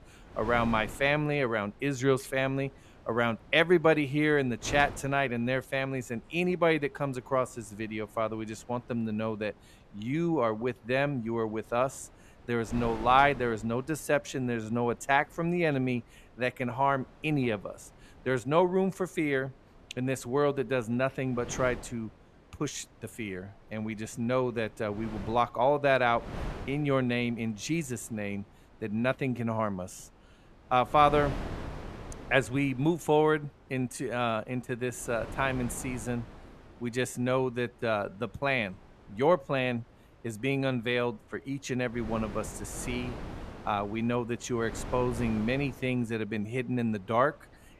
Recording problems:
wind noise on the microphone; occasional gusts; 20 dB below the speech

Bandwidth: 14 kHz